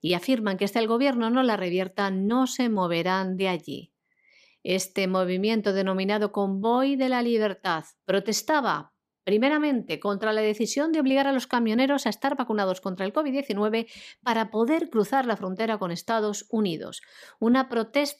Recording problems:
none

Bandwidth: 15 kHz